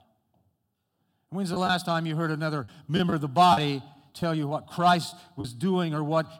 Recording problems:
choppy; occasionally; 5% of the speech affected

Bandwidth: 17 kHz